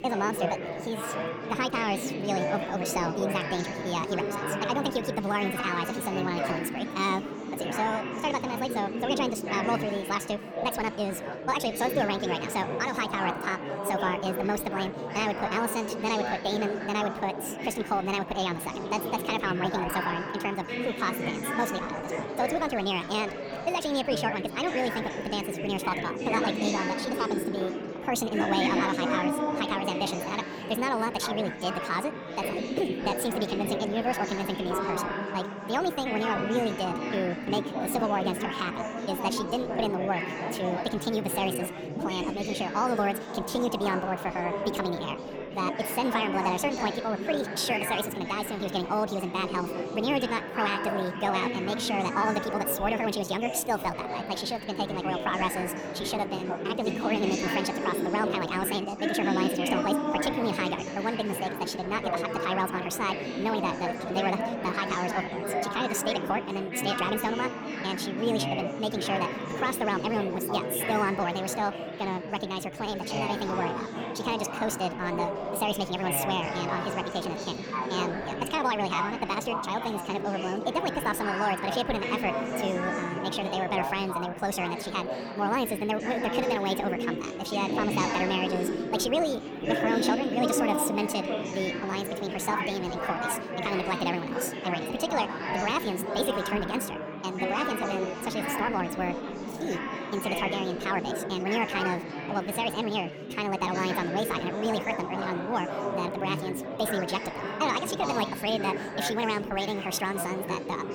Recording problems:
wrong speed and pitch; too fast and too high; 1.7 times normal speed
chatter from many people; loud; throughout; 2 dB below the speech

